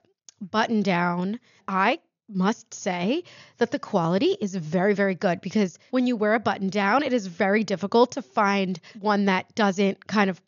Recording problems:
high frequencies cut off; noticeable; nothing above 7 kHz

